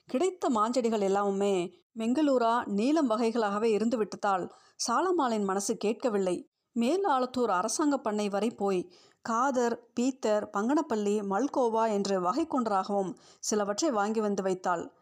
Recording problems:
none

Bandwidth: 15 kHz